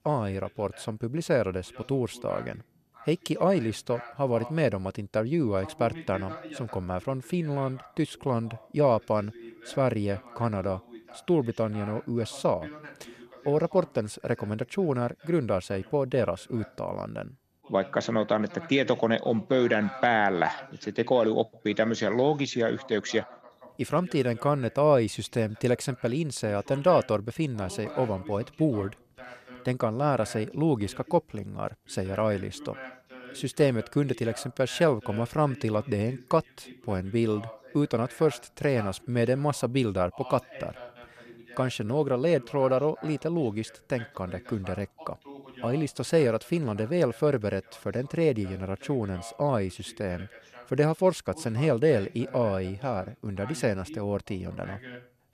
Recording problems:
voice in the background; noticeable; throughout; 20 dB below the speech

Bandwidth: 14 kHz